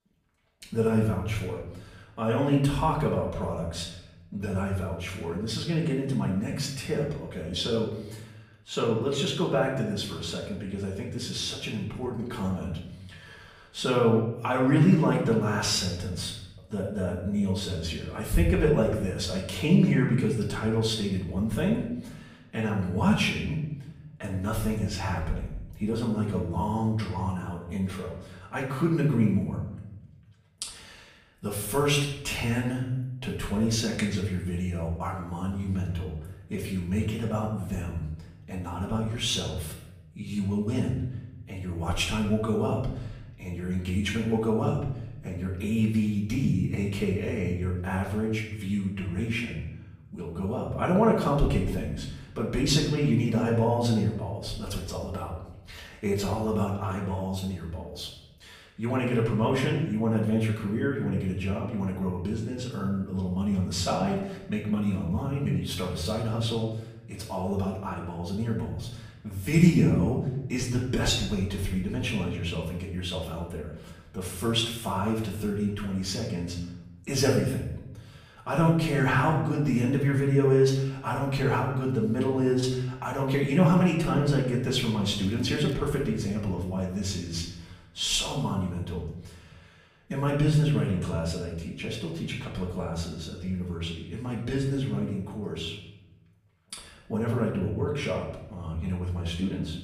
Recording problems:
off-mic speech; far
room echo; noticeable; dies away in 0.8 s
crackling; faint; at 1:25; 30 dB below the speech

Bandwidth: 15 kHz